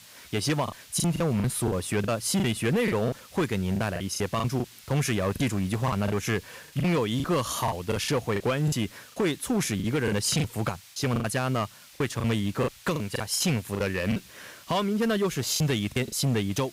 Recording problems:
distortion; slight; 9% of the sound clipped
hiss; faint; throughout; 20 dB below the speech
choppy; very; 11% of the speech affected

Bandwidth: 15.5 kHz